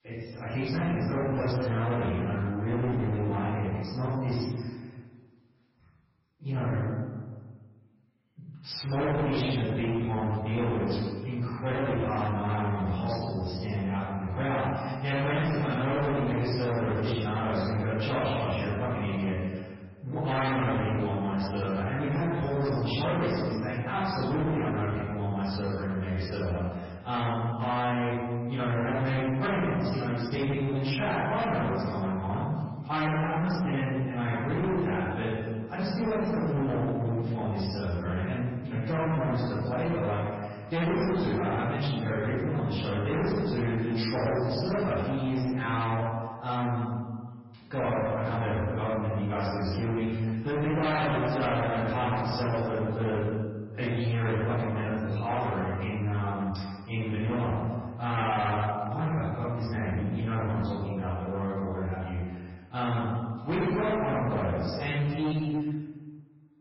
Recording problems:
distortion; heavy; 23% of the sound clipped
room echo; strong; dies away in 1.3 s
off-mic speech; far
garbled, watery; badly; nothing above 5.5 kHz

